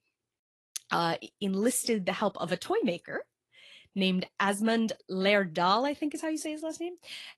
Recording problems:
garbled, watery; slightly; nothing above 12 kHz

